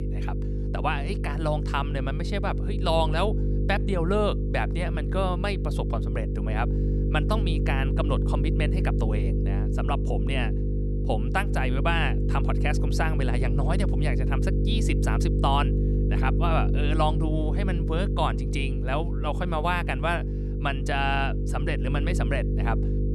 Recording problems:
electrical hum; loud; throughout; 50 Hz, 7 dB below the speech

